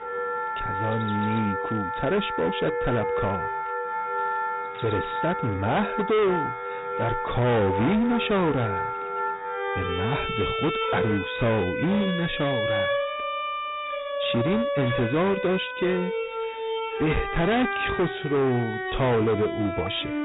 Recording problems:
distortion; heavy; 12% of the sound clipped
high frequencies cut off; severe; nothing above 4 kHz
background music; loud; throughout; 3 dB below the speech
animal sounds; faint; throughout; 25 dB below the speech

